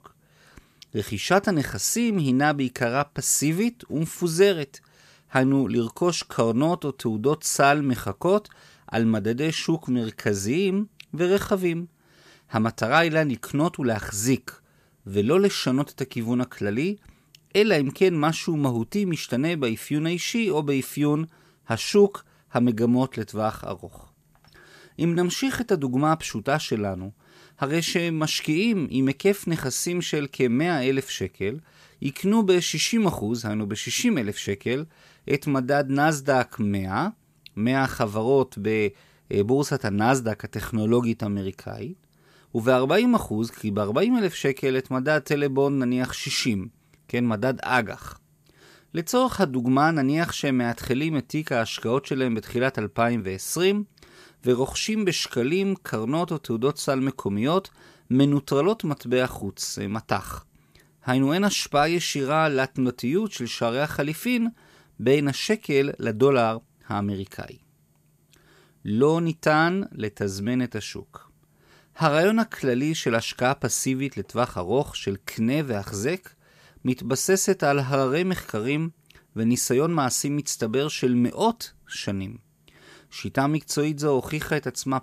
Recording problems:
none

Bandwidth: 14.5 kHz